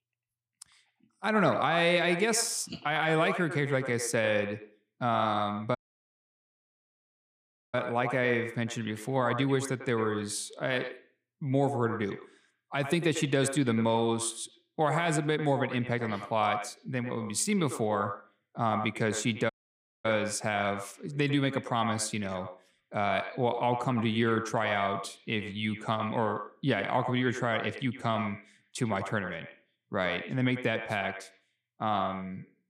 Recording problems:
echo of what is said; strong; throughout; 100 ms later, 9 dB below the speech
audio cutting out; at 6 s for 2 s and at 20 s for 0.5 s

